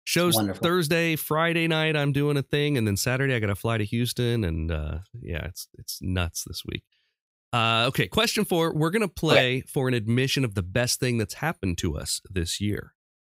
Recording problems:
none

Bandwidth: 15.5 kHz